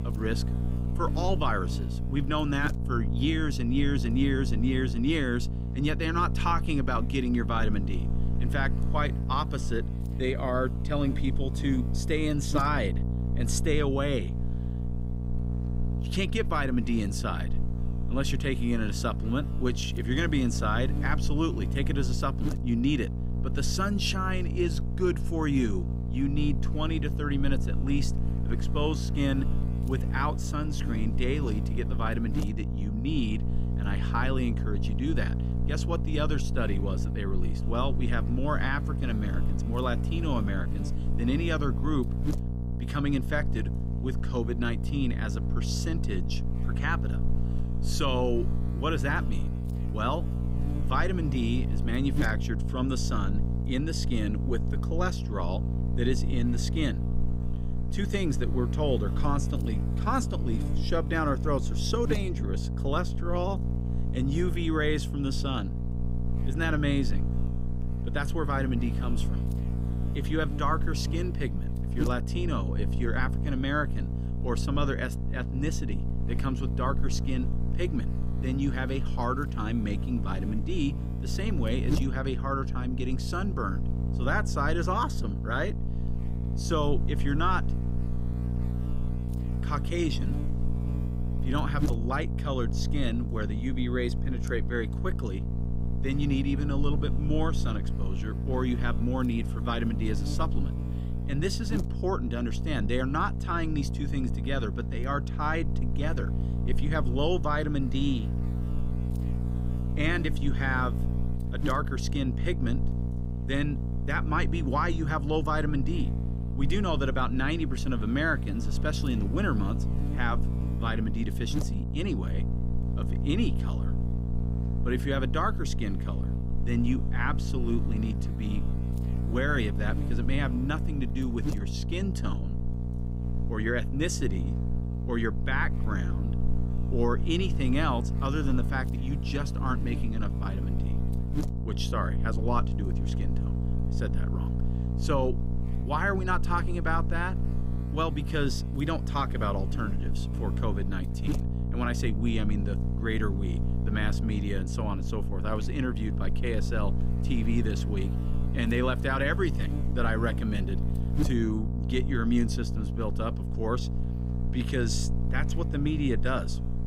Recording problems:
electrical hum; loud; throughout; 60 Hz, 9 dB below the speech

